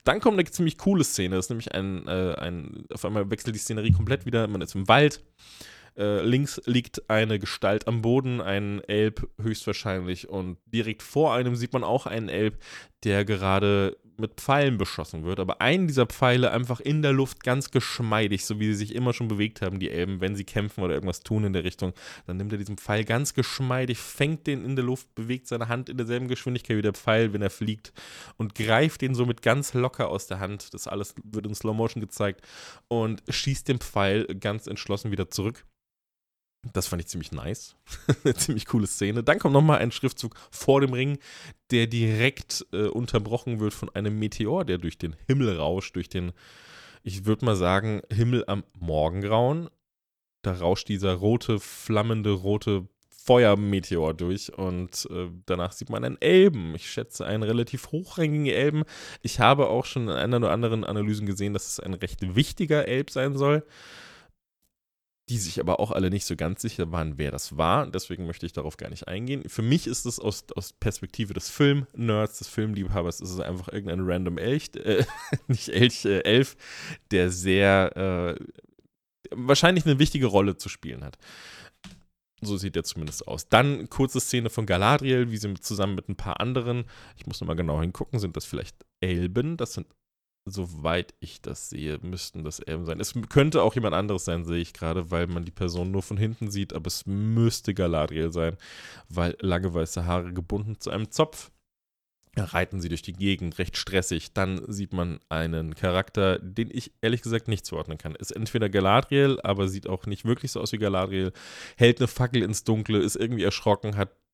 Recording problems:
none

